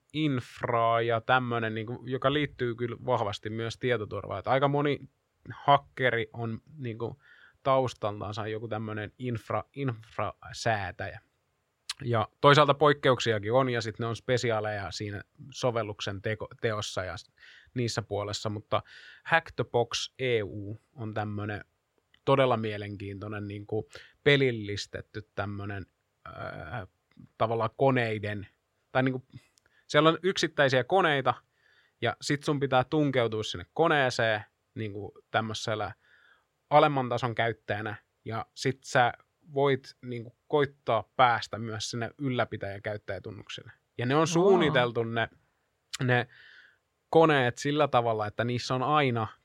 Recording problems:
none

